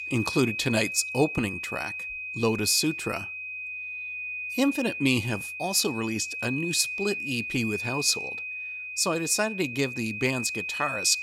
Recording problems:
high-pitched whine; loud; throughout; 2.5 kHz, 5 dB below the speech

